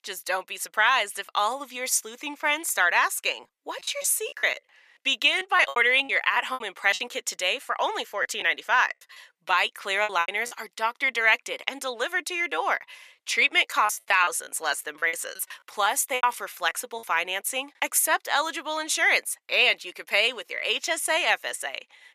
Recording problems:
thin; very; fading below 750 Hz
choppy; very; from 4 to 7 s, from 8 to 11 s and from 14 to 17 s; 14% of the speech affected

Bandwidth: 14.5 kHz